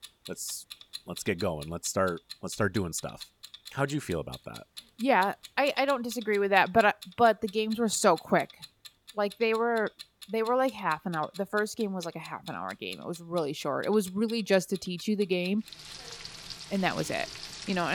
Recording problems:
household noises; noticeable; throughout; 15 dB below the speech
abrupt cut into speech; at the end

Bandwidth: 17.5 kHz